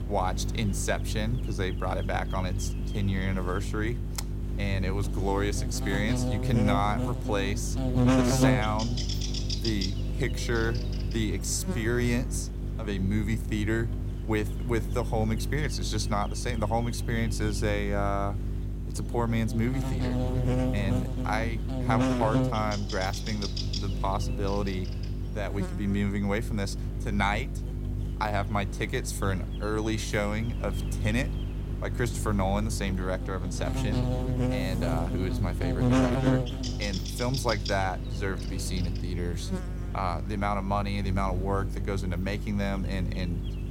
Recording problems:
electrical hum; loud; throughout; 50 Hz, 5 dB below the speech
wind noise on the microphone; occasional gusts; 20 dB below the speech

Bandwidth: 16 kHz